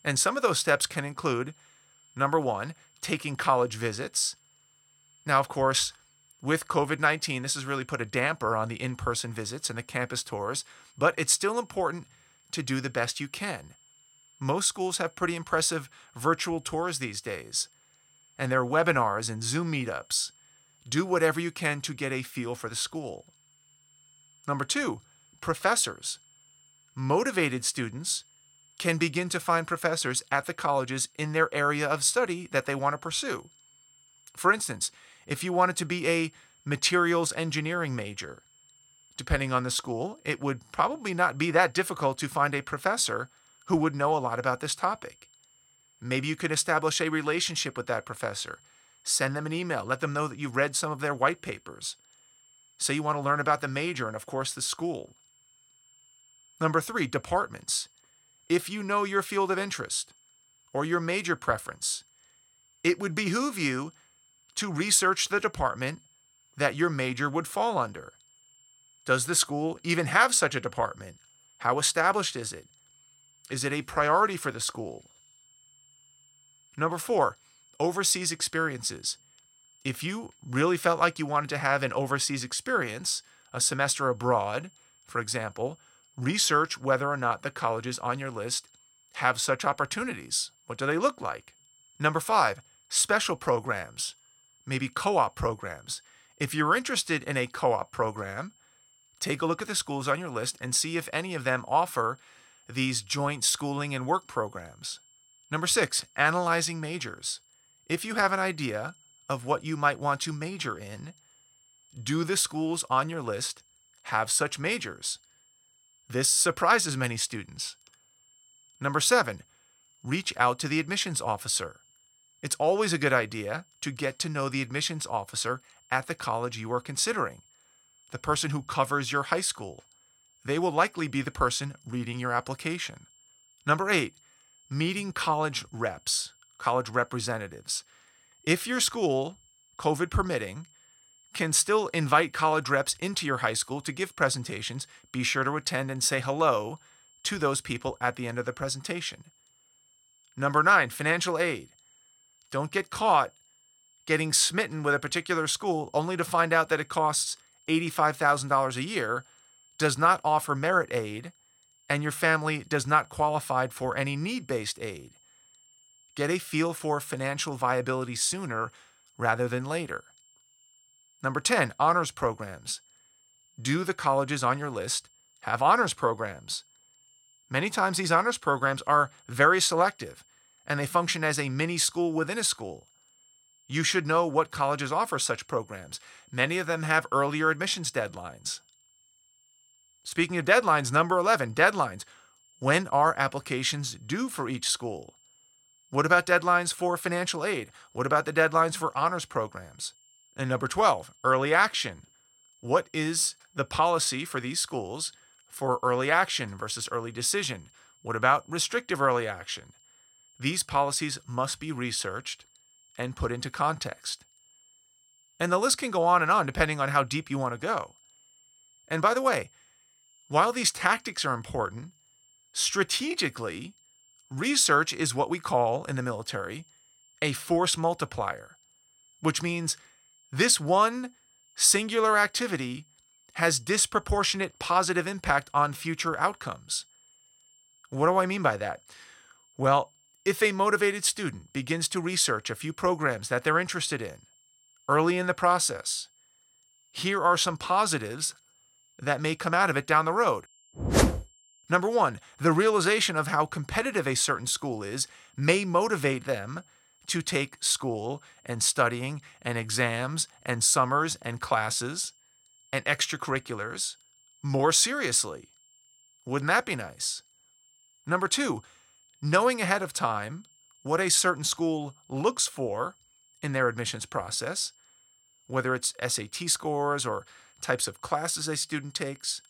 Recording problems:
high-pitched whine; faint; throughout; 7.5 kHz, 30 dB below the speech

